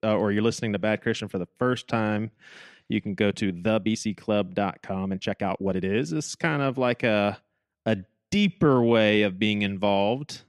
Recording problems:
uneven, jittery; strongly; from 1.5 to 9 s

